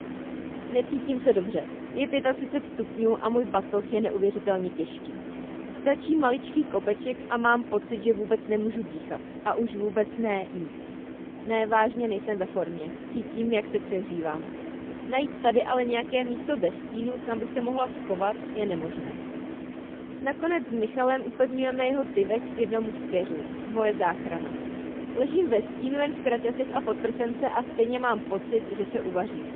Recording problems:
phone-call audio; poor line; nothing above 3.5 kHz
traffic noise; loud; throughout; 10 dB below the speech

